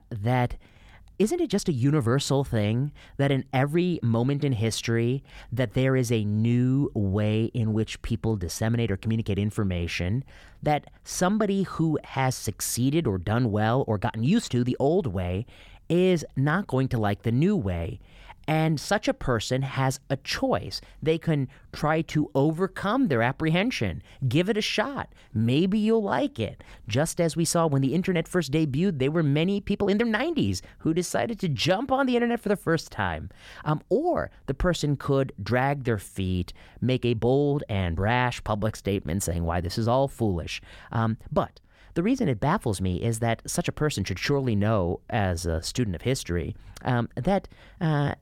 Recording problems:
uneven, jittery; strongly; from 1 to 46 s

